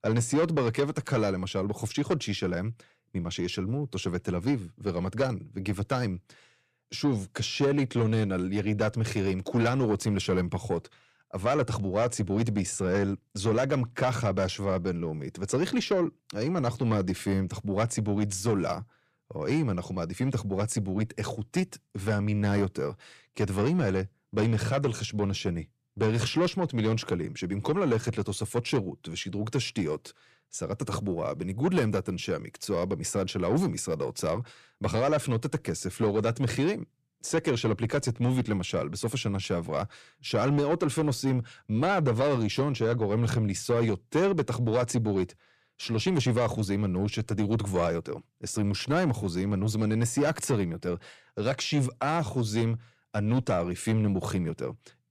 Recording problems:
distortion; slight; 10 dB below the speech

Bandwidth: 14.5 kHz